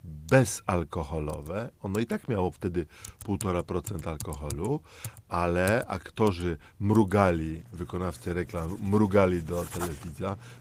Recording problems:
garbled, watery; slightly; nothing above 15.5 kHz
household noises; noticeable; throughout; 15 dB below the speech

